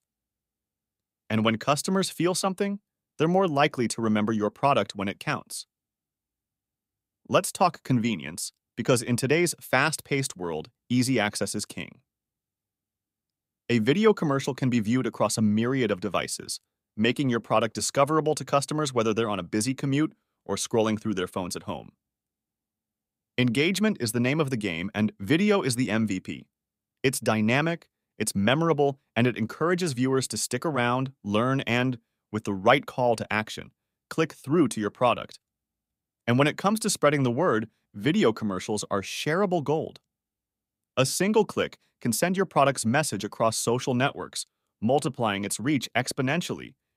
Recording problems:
none

